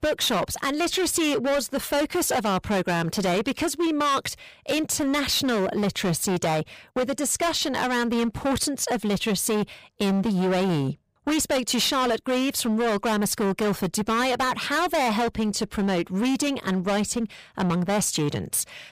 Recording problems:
distortion; heavy; 23% of the sound clipped

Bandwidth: 15 kHz